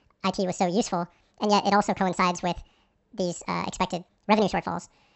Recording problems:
wrong speed and pitch; too fast and too high; 1.7 times normal speed
high frequencies cut off; noticeable; nothing above 8 kHz

